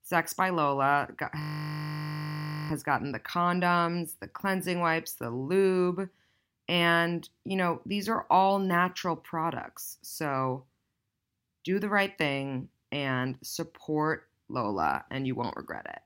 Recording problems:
audio freezing; at 1.5 s for 1.5 s

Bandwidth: 16 kHz